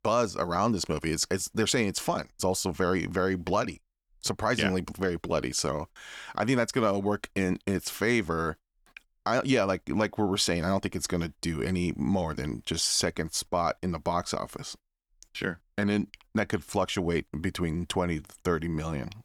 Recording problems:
none

